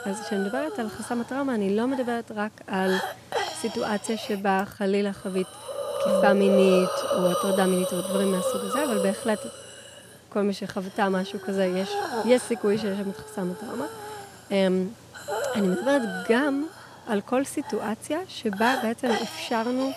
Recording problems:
hiss; loud; throughout; 4 dB below the speech

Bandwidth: 14.5 kHz